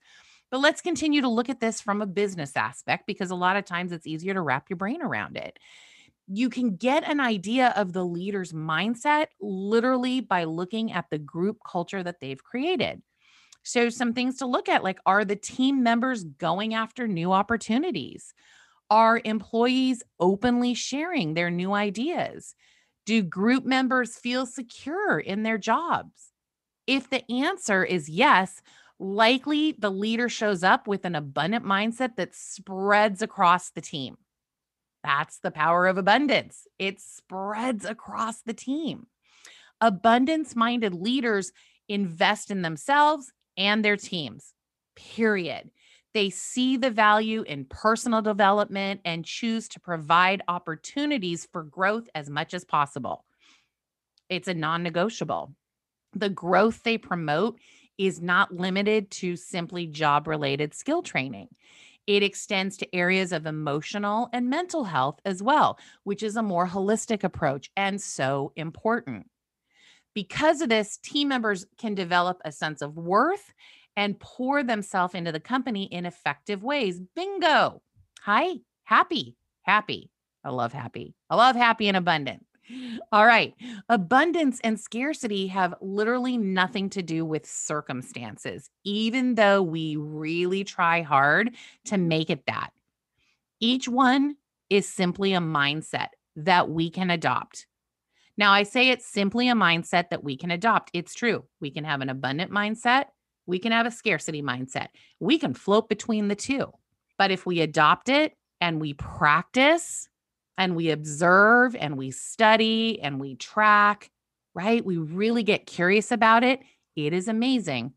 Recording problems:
none

